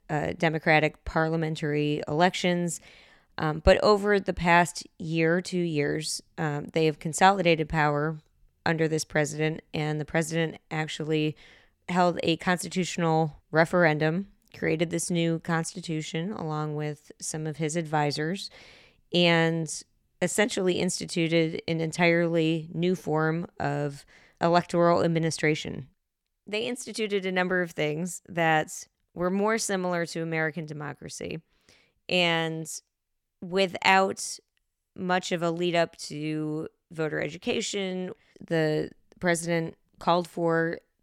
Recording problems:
none

